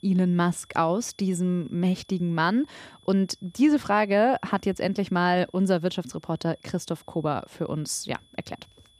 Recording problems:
high-pitched whine; faint; throughout; 3.5 kHz, 30 dB below the speech

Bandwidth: 15 kHz